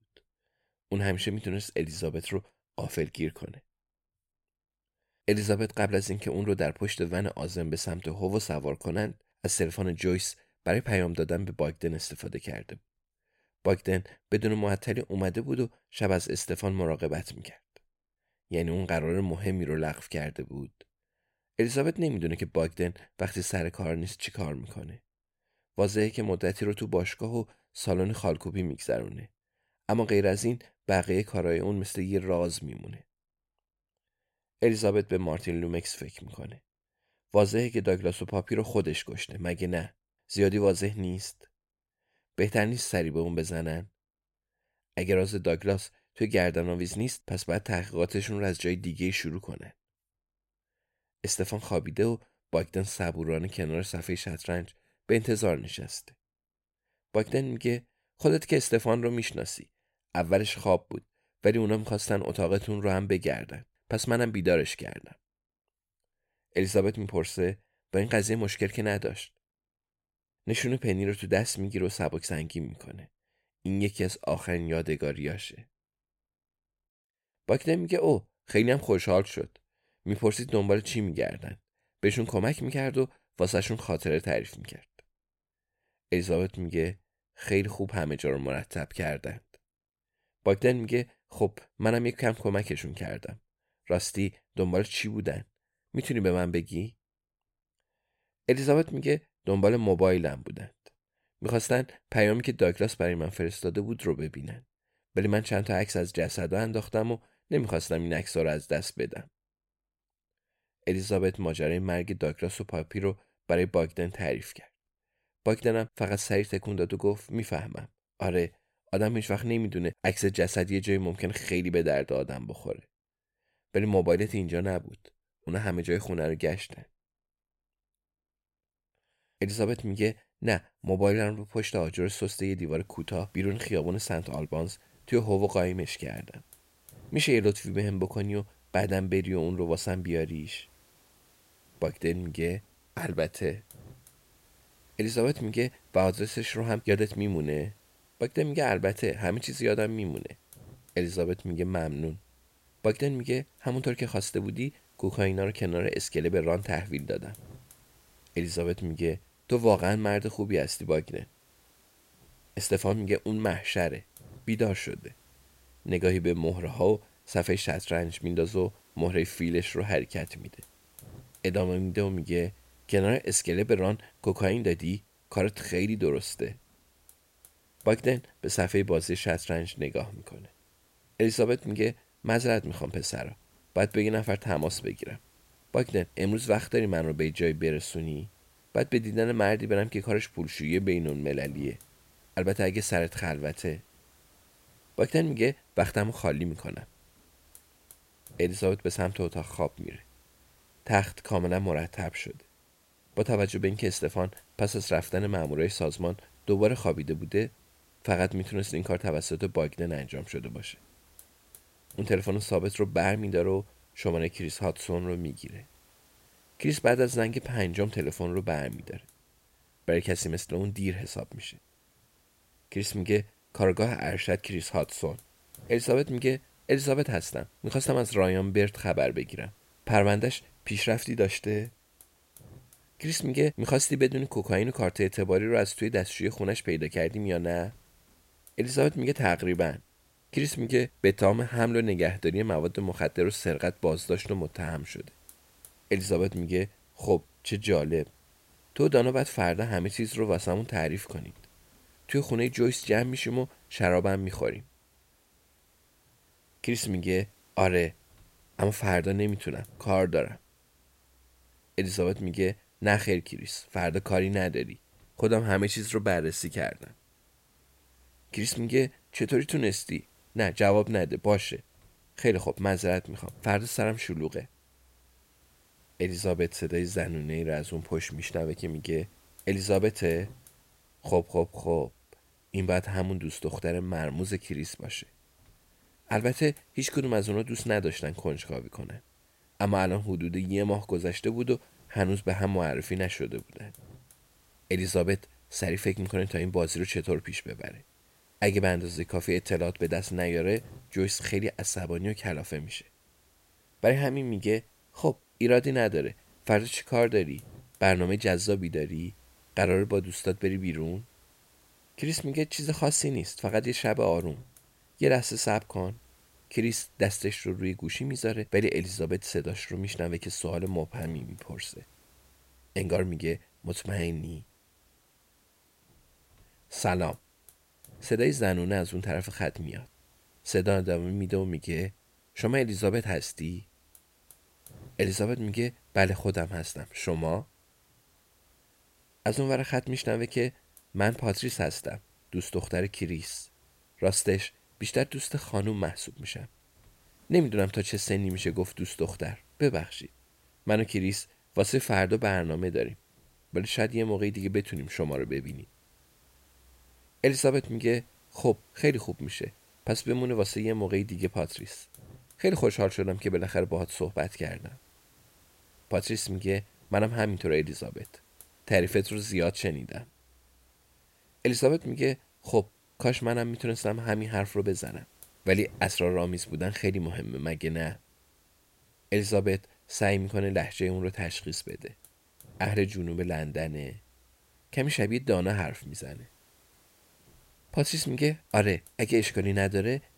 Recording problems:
hiss; faint; from 2:13 on; 30 dB below the speech

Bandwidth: 16 kHz